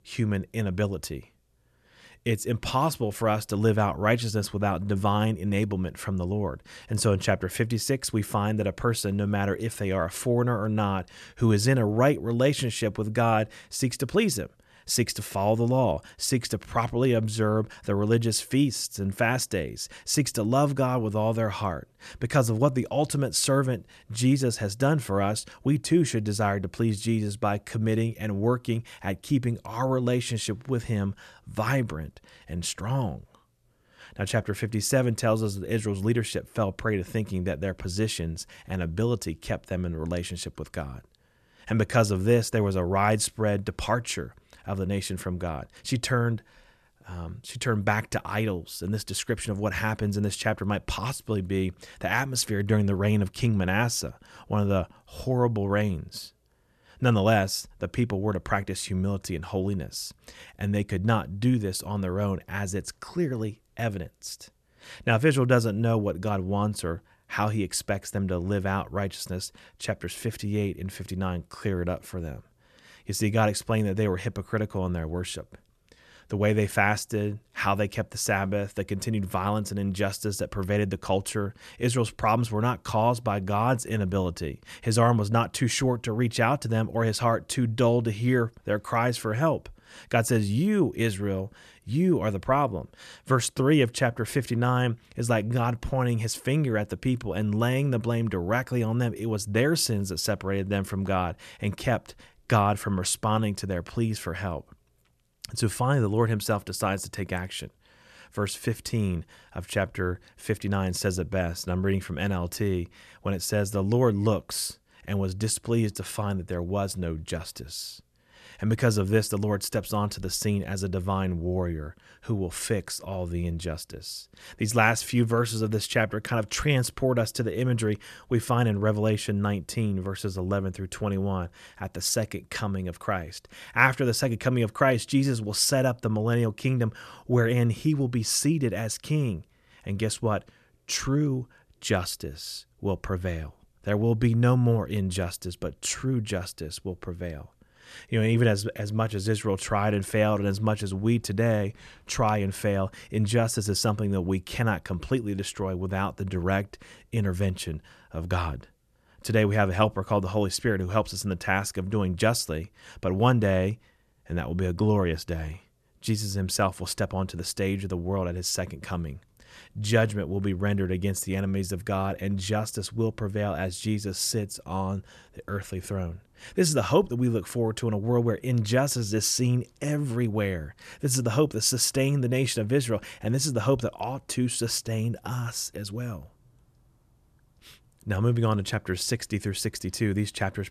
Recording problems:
none

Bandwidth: 13.5 kHz